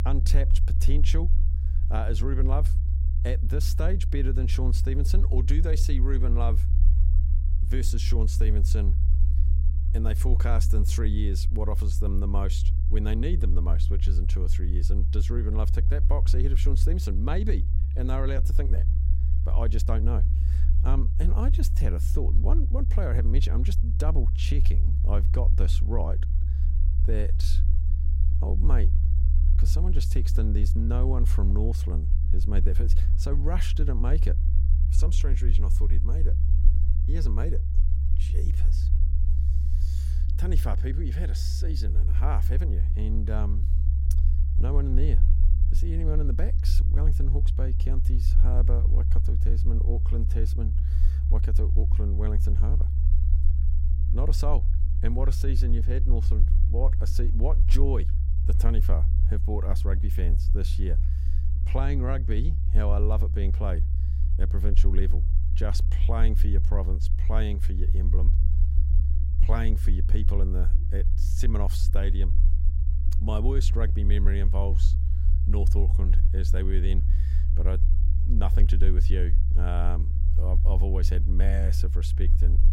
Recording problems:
low rumble; loud; throughout; 6 dB below the speech

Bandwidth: 16 kHz